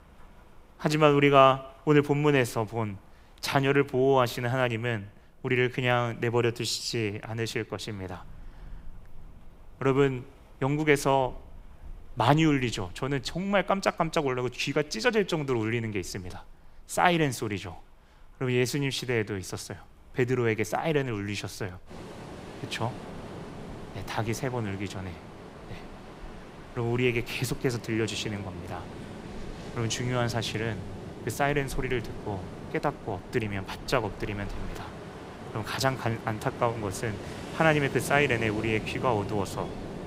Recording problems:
rain or running water; noticeable; throughout; 15 dB below the speech

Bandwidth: 15.5 kHz